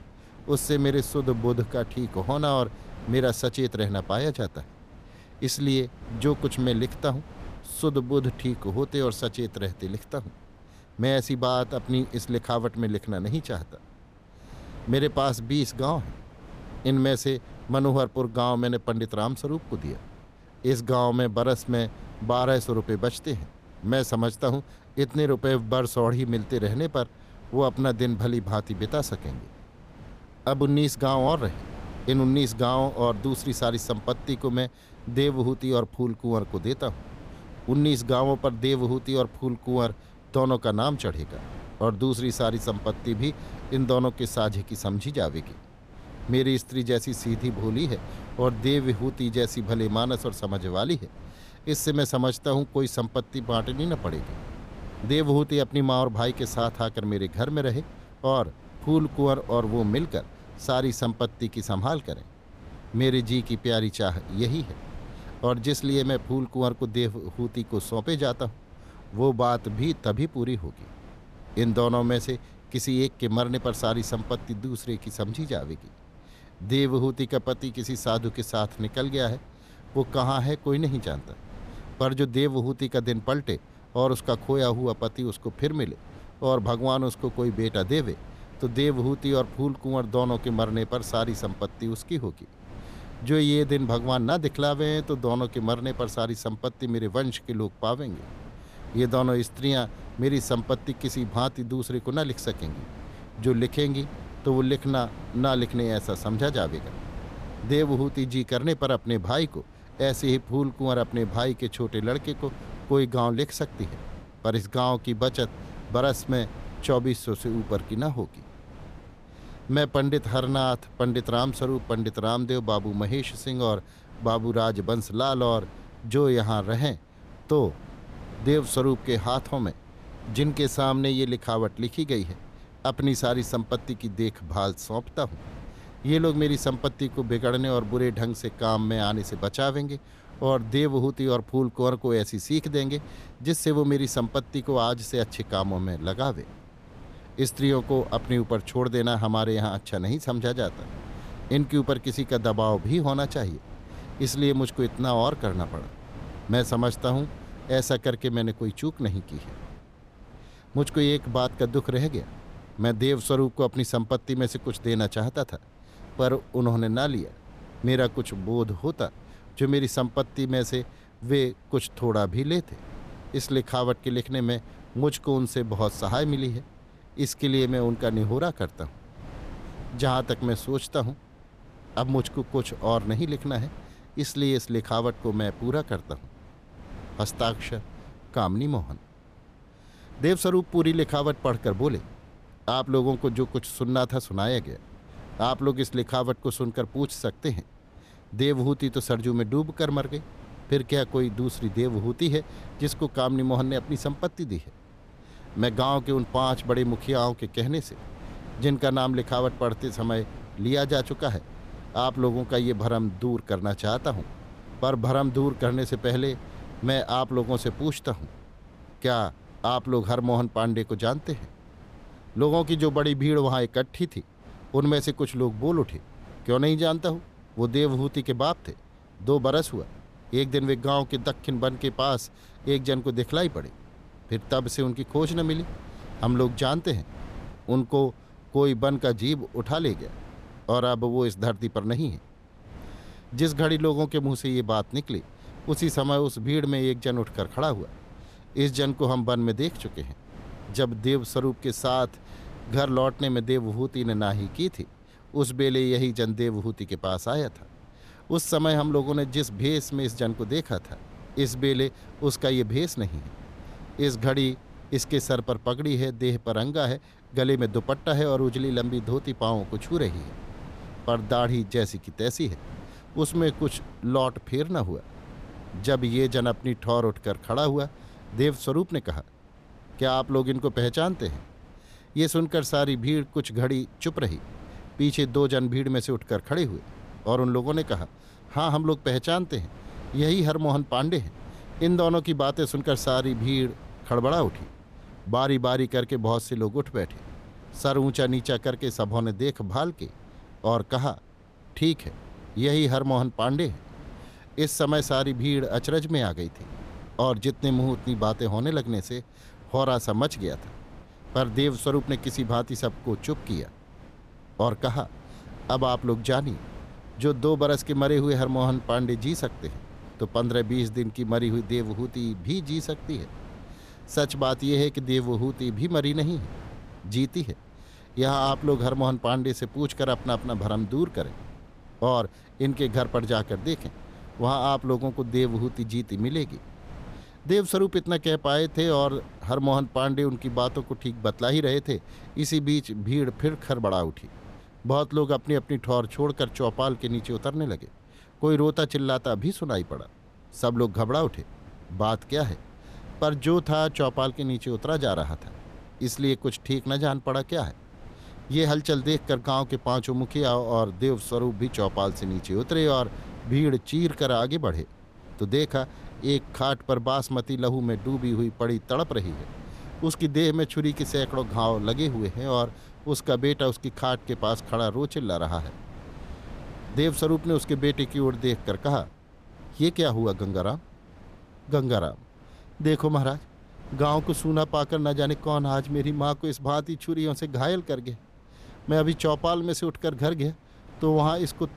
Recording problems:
wind noise on the microphone; occasional gusts; 20 dB below the speech

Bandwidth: 14.5 kHz